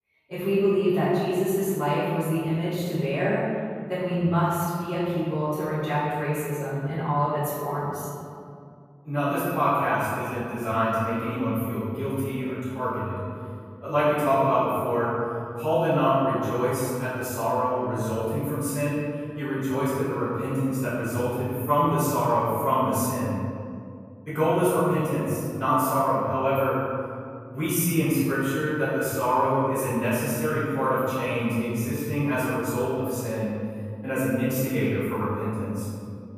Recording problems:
room echo; strong; dies away in 2.3 s
off-mic speech; far

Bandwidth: 14.5 kHz